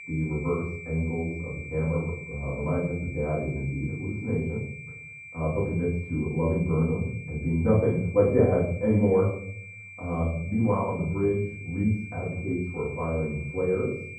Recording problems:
off-mic speech; far
muffled; very; fading above 1 kHz
room echo; noticeable; dies away in 0.6 s
high-pitched whine; noticeable; throughout; 2.5 kHz, 15 dB below the speech

